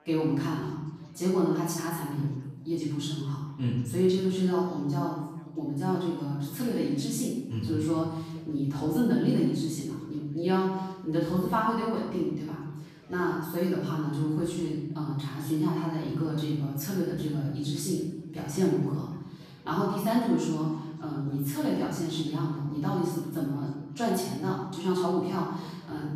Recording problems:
off-mic speech; far
room echo; noticeable; dies away in 1 s
background chatter; faint; throughout; 3 voices, 30 dB below the speech

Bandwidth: 14.5 kHz